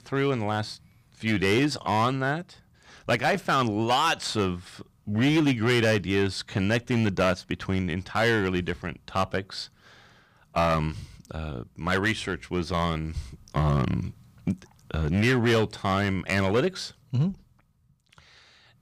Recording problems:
distortion; slight; 5% of the sound clipped

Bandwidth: 15 kHz